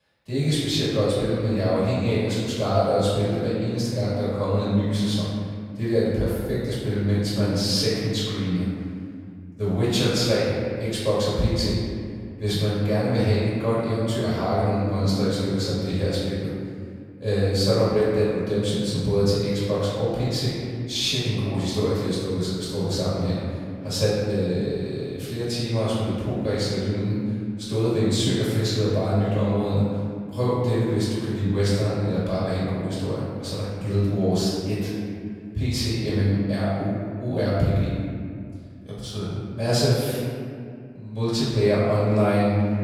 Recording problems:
room echo; strong; dies away in 2.1 s
off-mic speech; far

